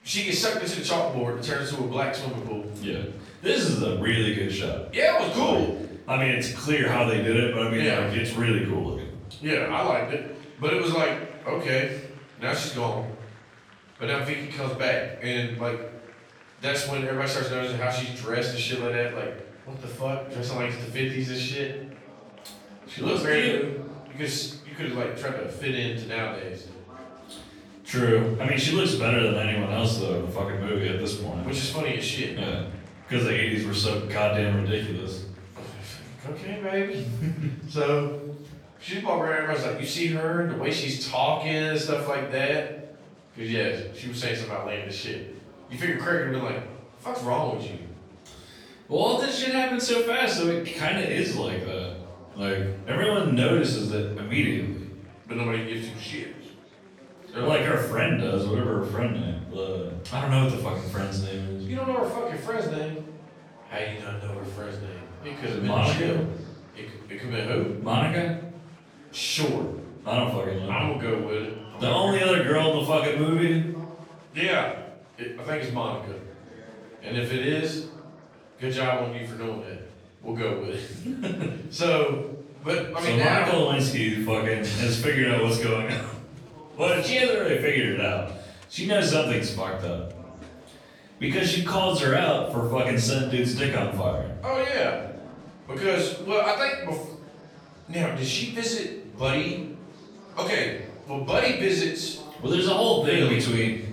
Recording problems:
off-mic speech; far
room echo; noticeable; dies away in 0.7 s
murmuring crowd; faint; throughout; 25 dB below the speech

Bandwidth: 18.5 kHz